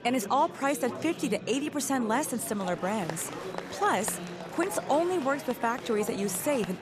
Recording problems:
murmuring crowd; loud; throughout; 10 dB below the speech

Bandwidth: 14.5 kHz